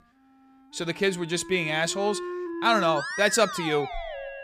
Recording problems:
background music; loud; throughout; 9 dB below the speech

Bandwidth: 15 kHz